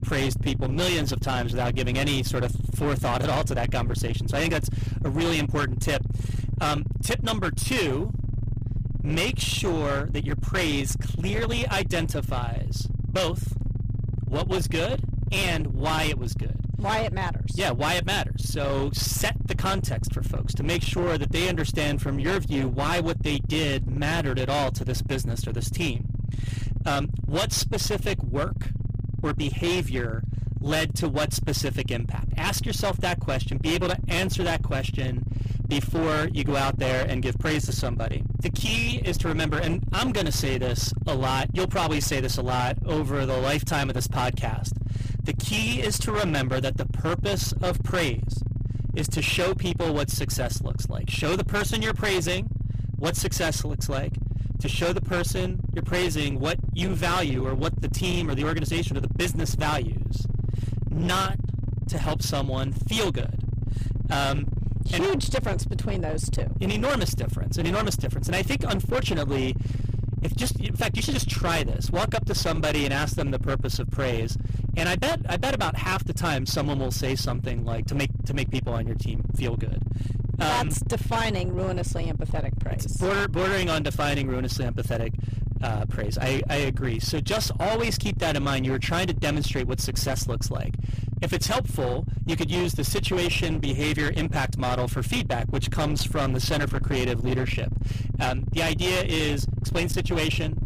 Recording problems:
distortion; heavy; 23% of the sound clipped
low rumble; noticeable; throughout; 10 dB below the speech

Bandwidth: 15 kHz